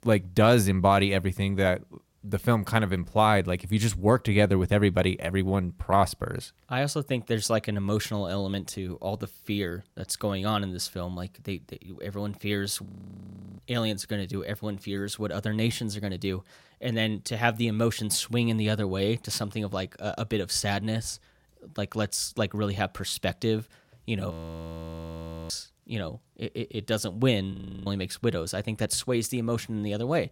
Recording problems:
audio freezing; at 13 s for 0.5 s, at 24 s for 1 s and at 28 s

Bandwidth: 16.5 kHz